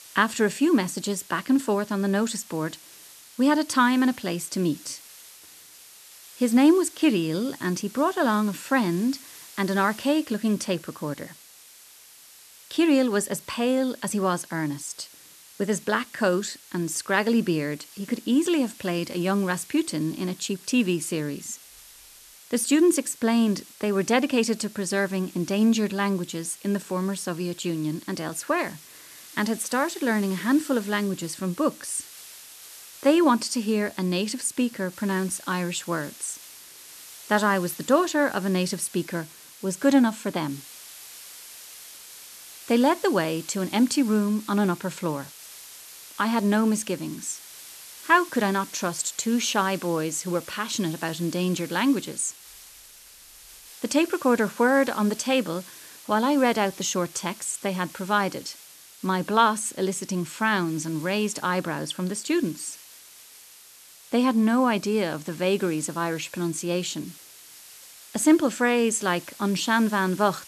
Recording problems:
hiss; noticeable; throughout; 20 dB below the speech

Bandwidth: 13.5 kHz